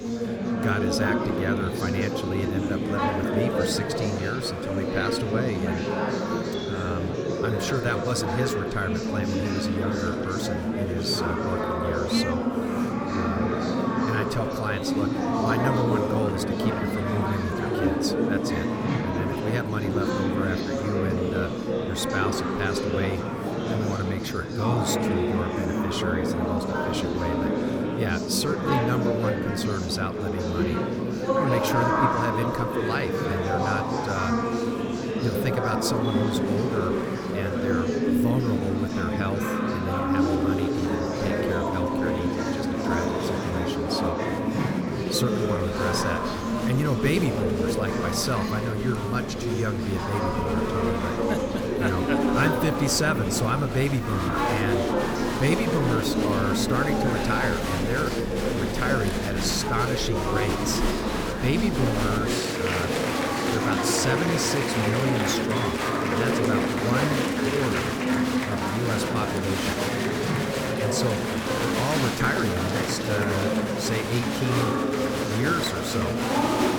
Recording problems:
murmuring crowd; very loud; throughout; 3 dB above the speech

